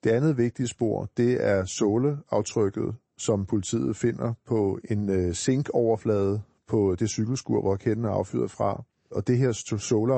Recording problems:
garbled, watery; slightly; nothing above 8 kHz
abrupt cut into speech; at the end

